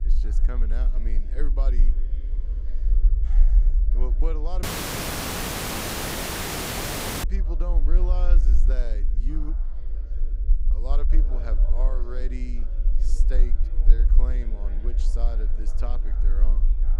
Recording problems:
low rumble; loud; throughout; 9 dB below the speech
voice in the background; noticeable; throughout; 10 dB below the speech
audio cutting out; at 4.5 s for 2.5 s

